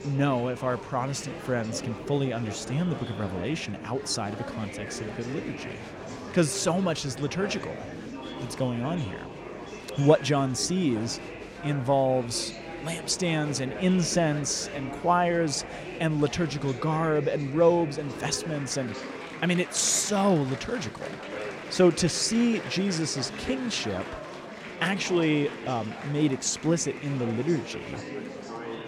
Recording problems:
murmuring crowd; noticeable; throughout; 10 dB below the speech

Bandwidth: 16.5 kHz